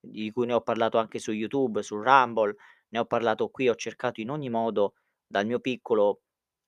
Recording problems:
none

